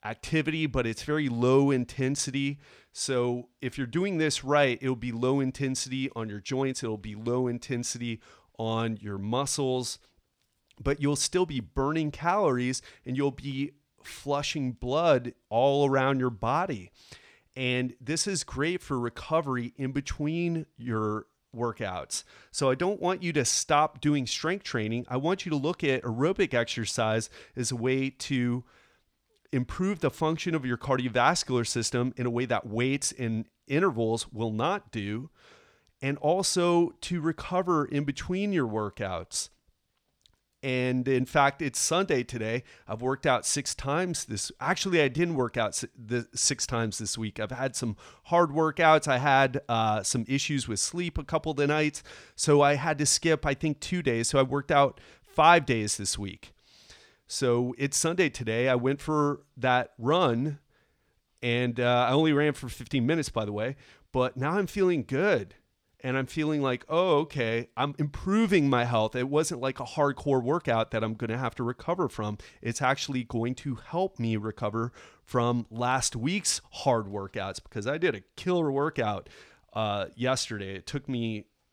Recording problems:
uneven, jittery; slightly; from 6.5 s to 1:08

